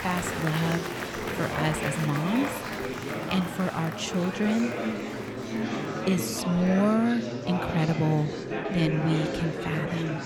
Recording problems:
murmuring crowd; loud; throughout; 4 dB below the speech

